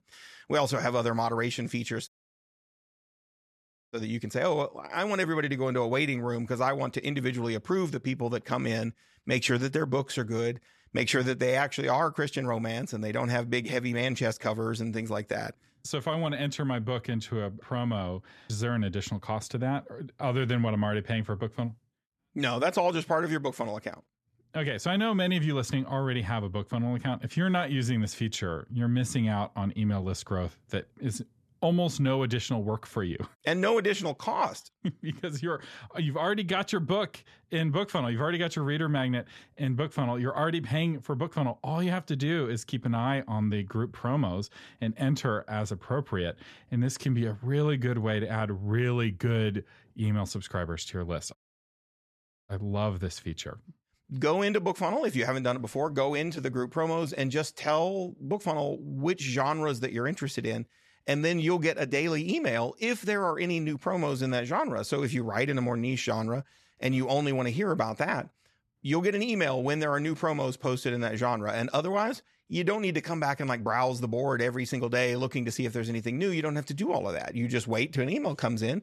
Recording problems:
audio cutting out; at 2 s for 2 s and at 51 s for 1 s

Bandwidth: 13.5 kHz